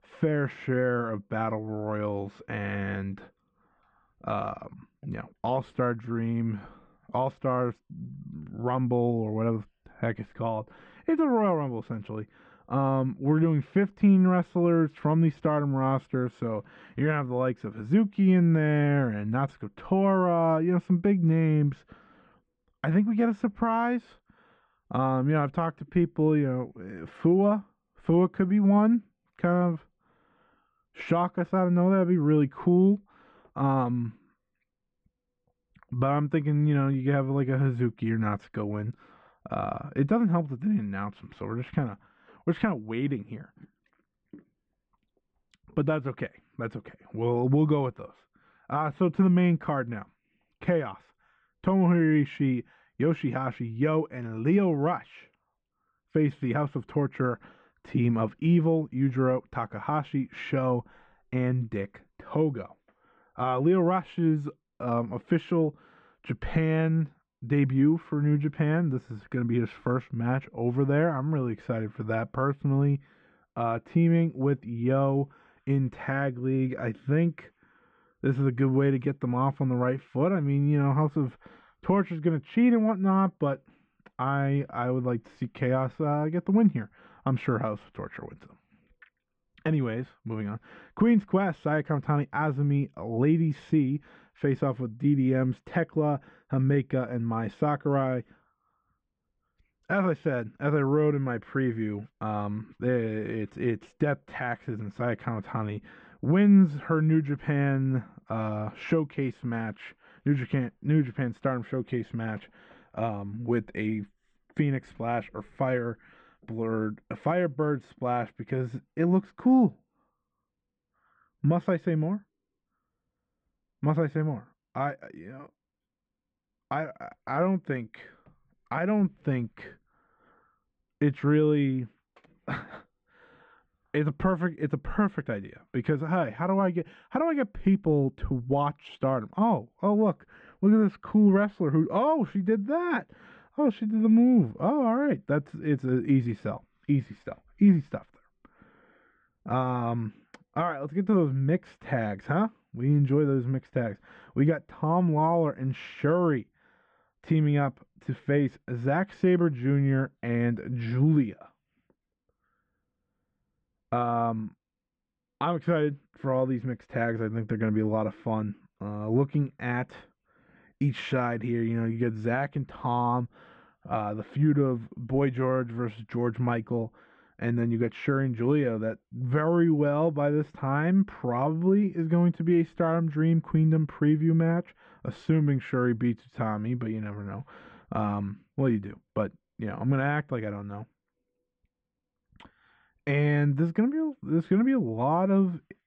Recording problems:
muffled; very; fading above 2.5 kHz

